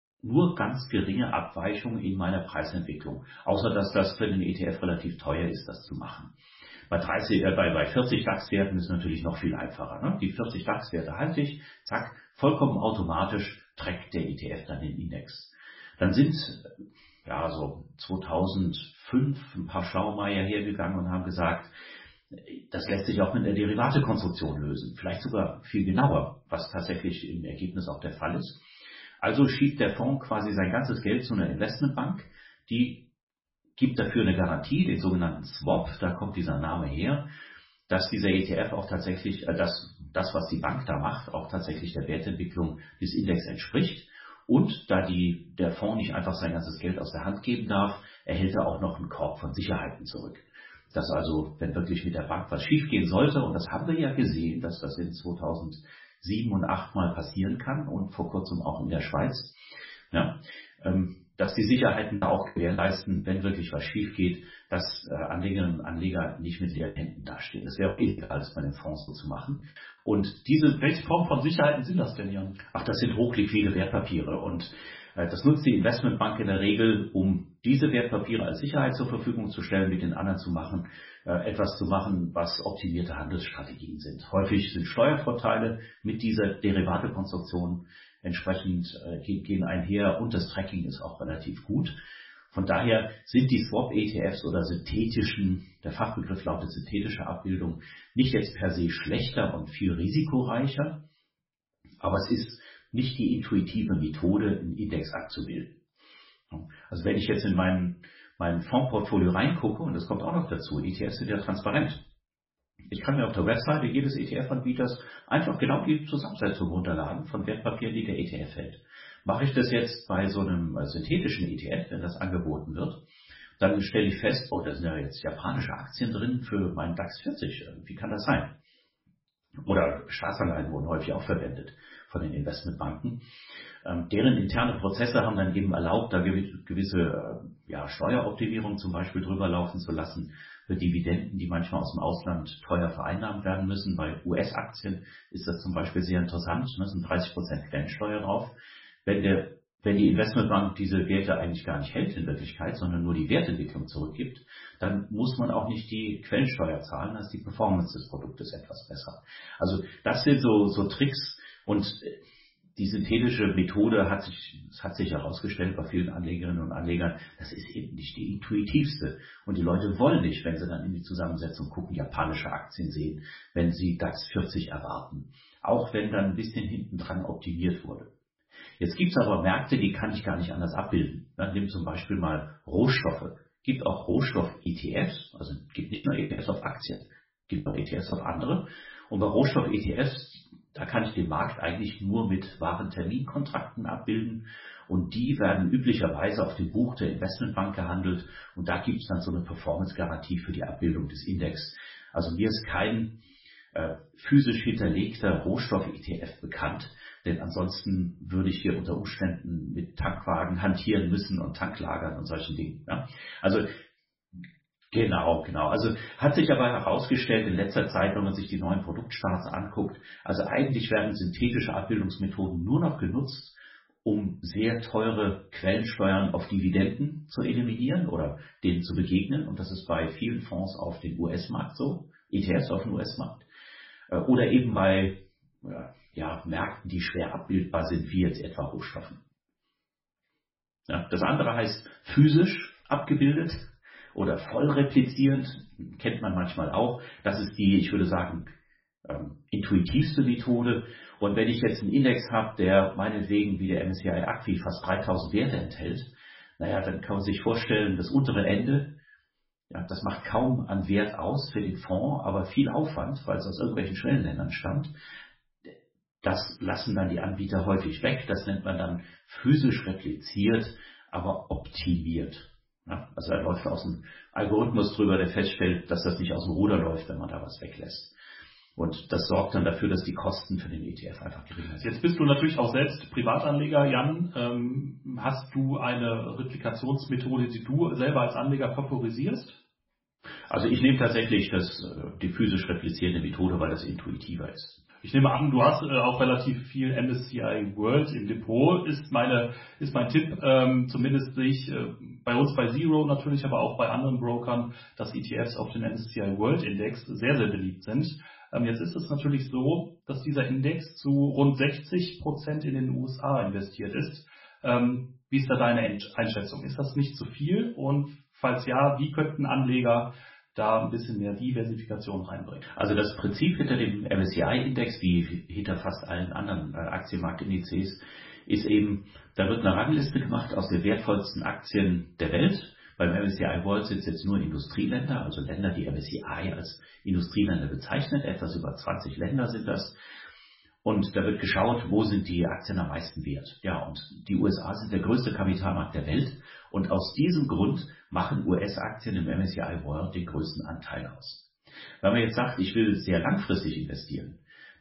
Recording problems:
off-mic speech; far
garbled, watery; badly; nothing above 5.5 kHz
room echo; slight; dies away in 0.4 s
choppy; very; from 1:01 to 1:04, from 1:07 to 1:10 and from 3:04 to 3:08; 15% of the speech affected

